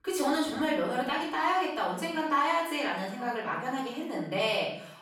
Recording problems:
off-mic speech; far
room echo; noticeable; dies away in 0.6 s
echo of what is said; faint; from 3 s on; 440 ms later, 25 dB below the speech

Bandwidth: 17.5 kHz